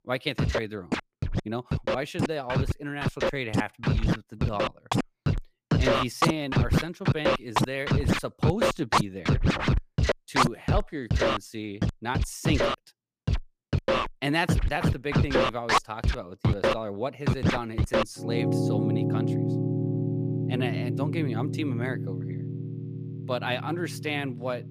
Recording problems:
background music; very loud; throughout; 5 dB above the speech

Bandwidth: 15 kHz